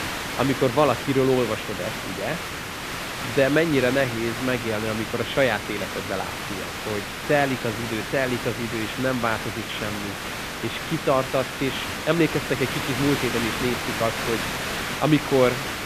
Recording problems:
high frequencies cut off; severe; nothing above 4 kHz
hiss; loud; throughout; 4 dB below the speech

